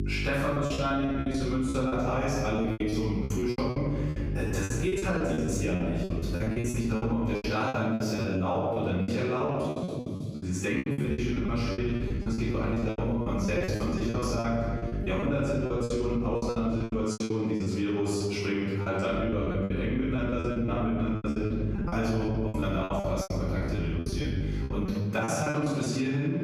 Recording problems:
room echo; strong; dies away in 1.4 s
off-mic speech; far
squashed, flat; somewhat
electrical hum; noticeable; until 7.5 s, from 11 to 17 s and from 19 to 25 s; 50 Hz, 15 dB below the speech
choppy; very; 20% of the speech affected

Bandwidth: 15 kHz